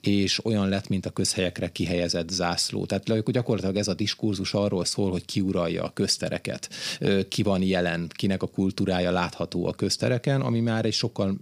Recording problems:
none

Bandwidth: 15 kHz